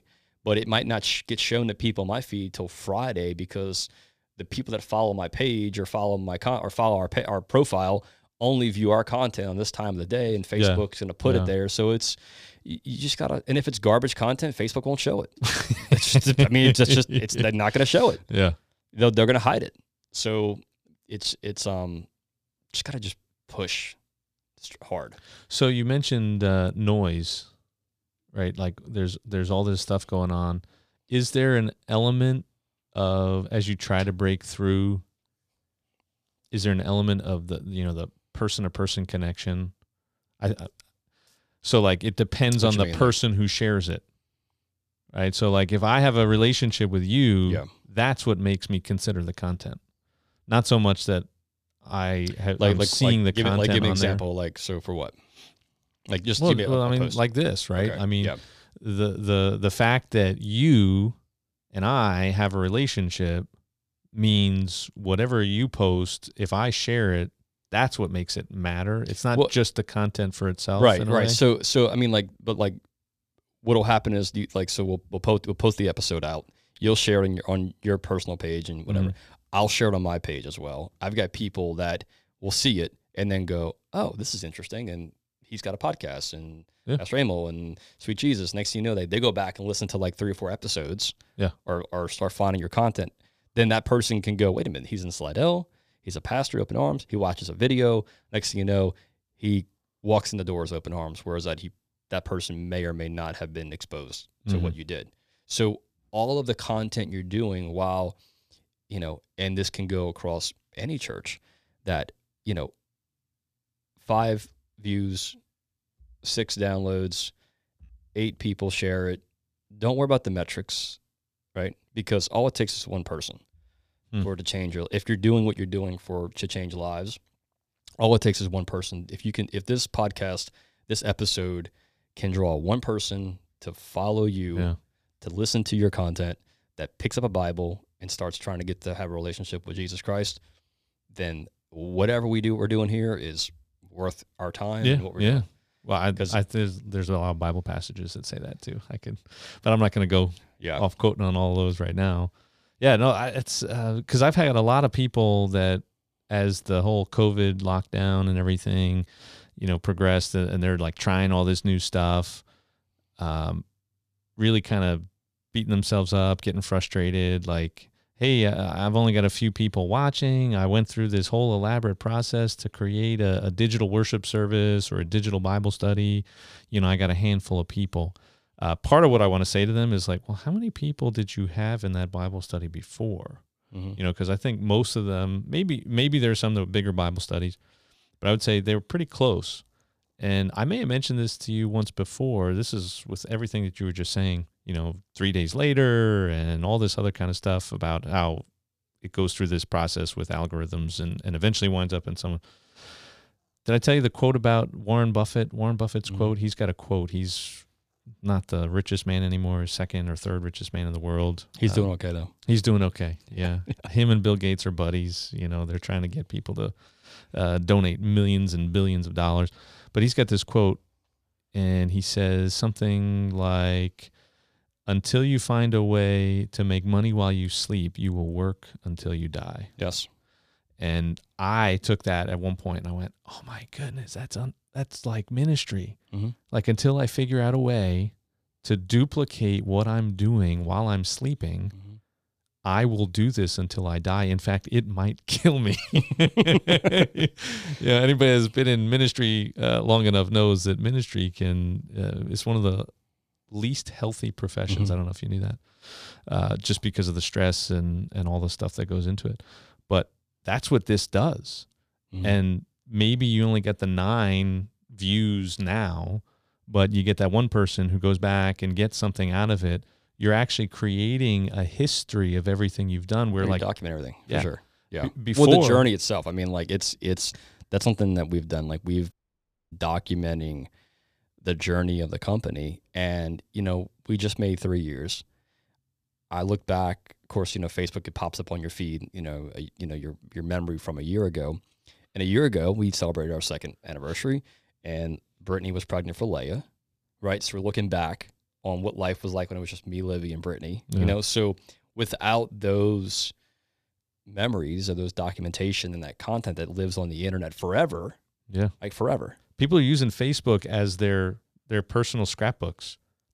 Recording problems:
audio cutting out; at 4:39 for 0.5 s

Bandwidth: 14.5 kHz